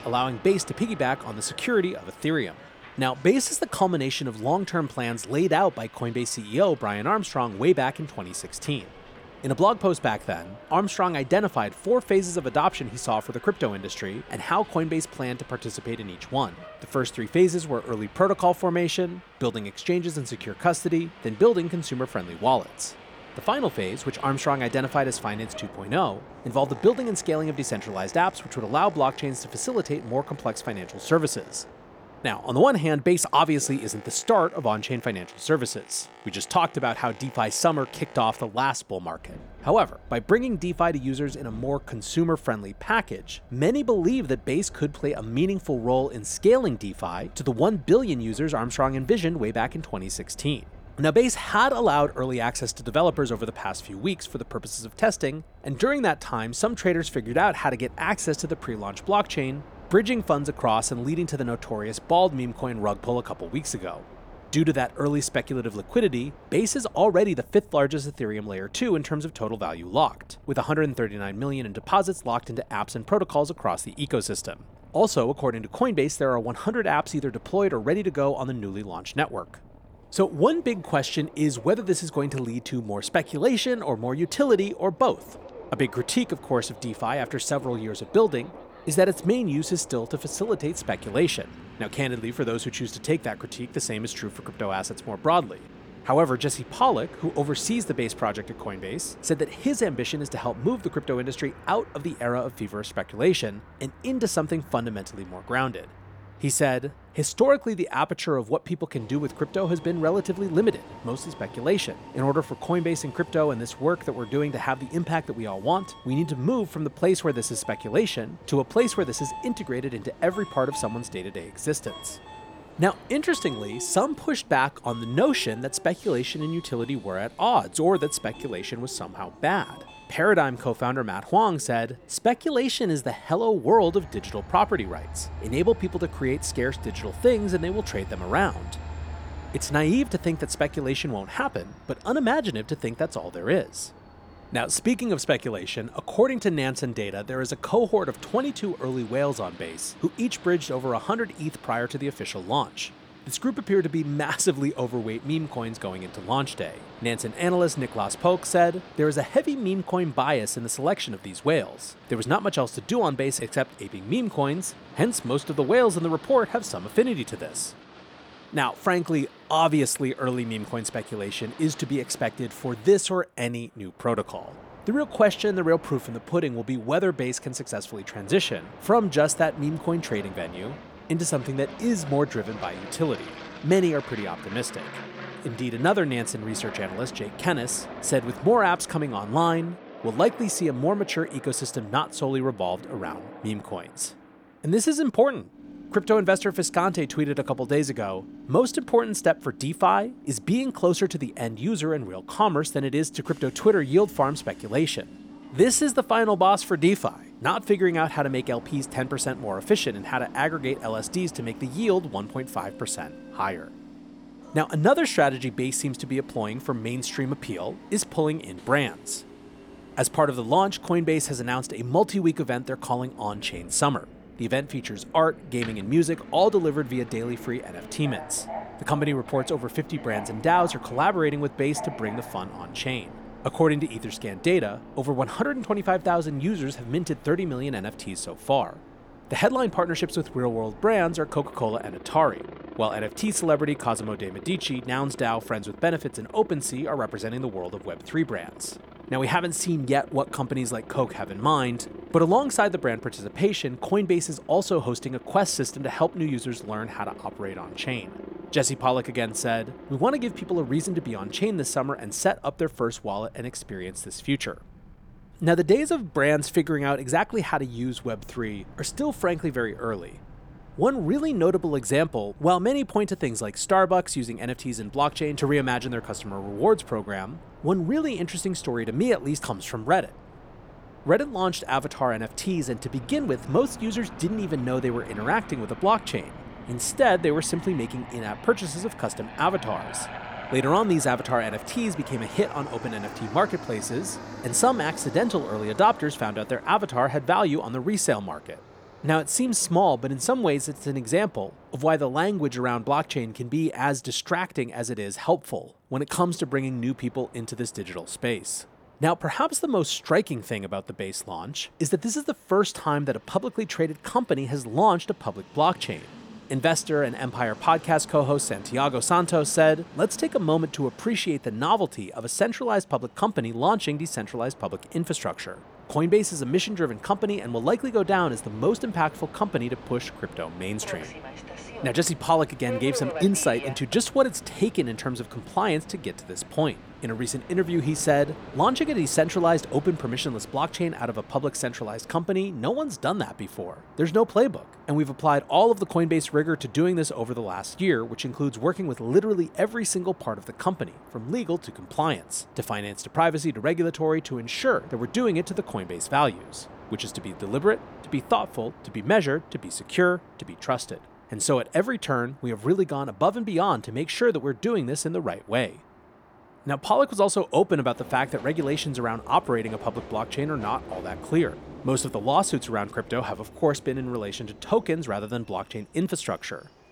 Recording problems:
train or aircraft noise; noticeable; throughout; 20 dB below the speech

